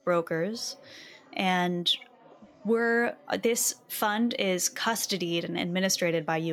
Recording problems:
chatter from many people; faint; throughout; 30 dB below the speech
abrupt cut into speech; at the end

